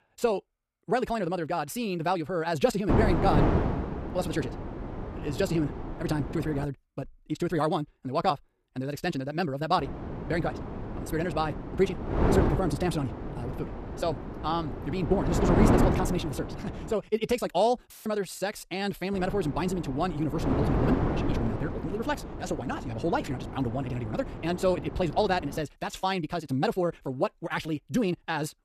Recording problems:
wrong speed, natural pitch; too fast; 1.8 times normal speed
wind noise on the microphone; heavy; from 3 to 6.5 s, from 10 to 17 s and from 19 to 26 s; 4 dB below the speech
audio cutting out; filled with static; at 18 s

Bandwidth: 14.5 kHz